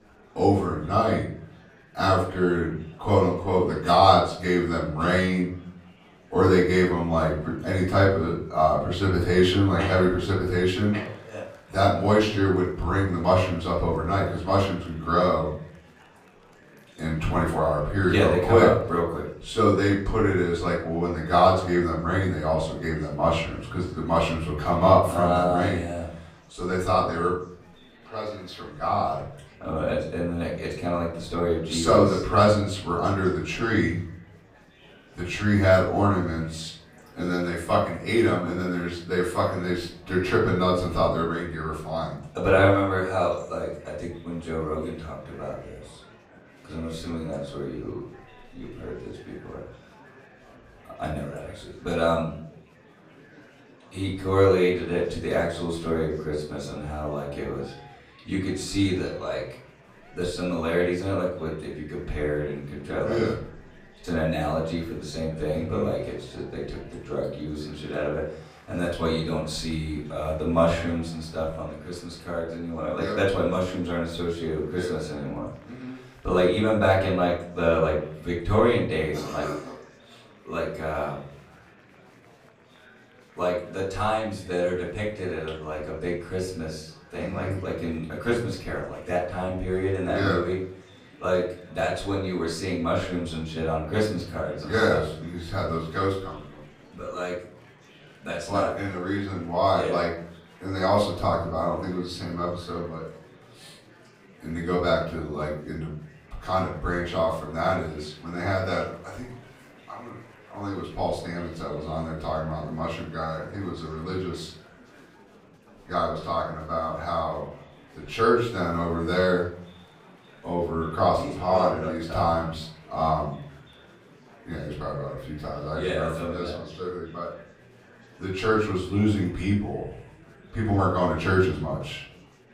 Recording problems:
off-mic speech; far
room echo; noticeable; dies away in 0.6 s
murmuring crowd; faint; throughout; 25 dB below the speech

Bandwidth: 15.5 kHz